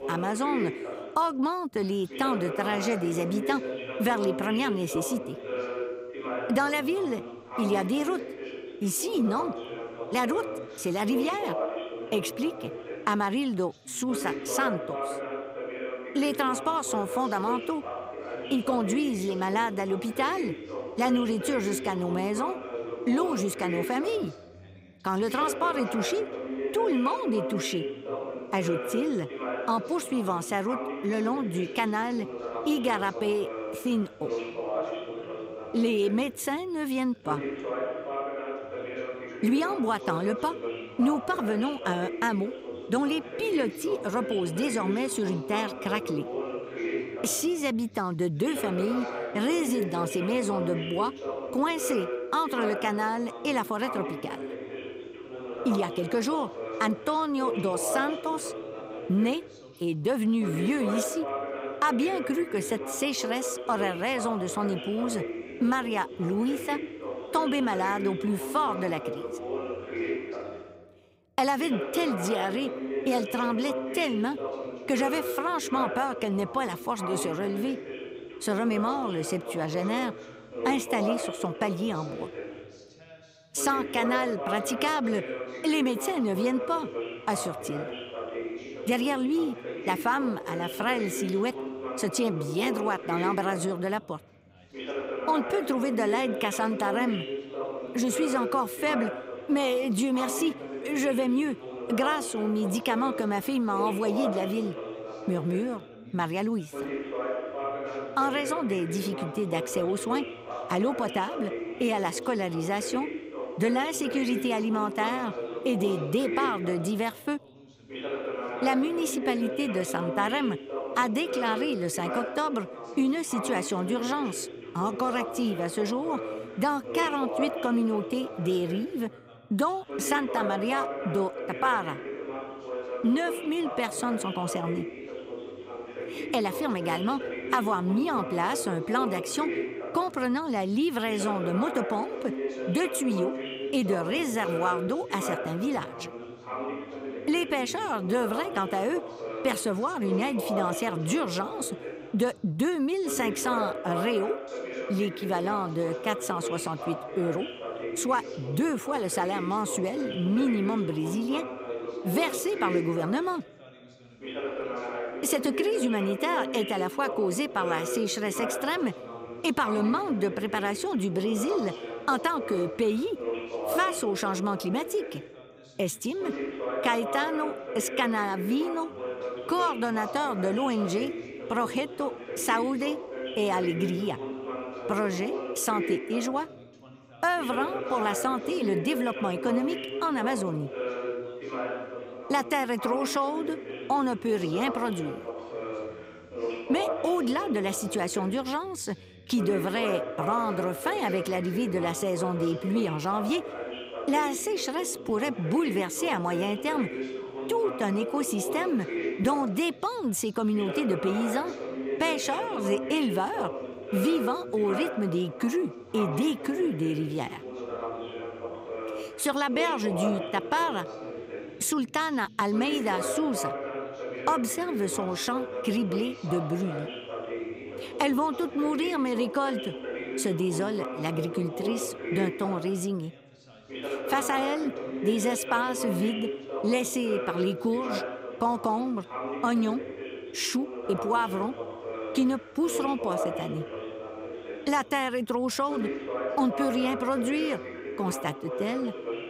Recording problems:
background chatter; loud; throughout; 2 voices, 6 dB below the speech

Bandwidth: 15.5 kHz